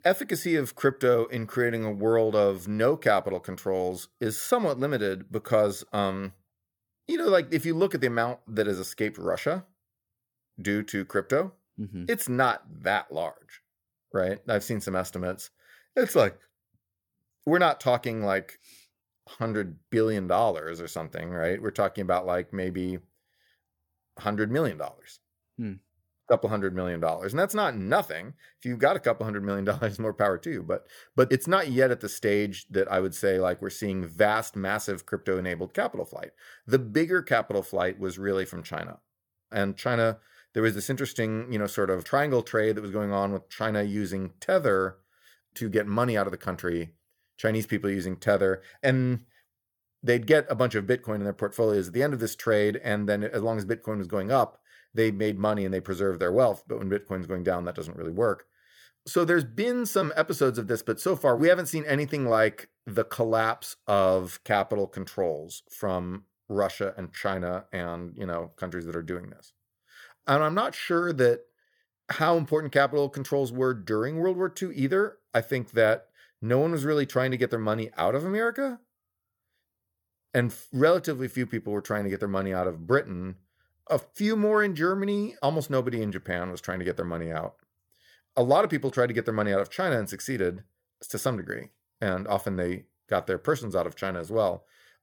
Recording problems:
none

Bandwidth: 18 kHz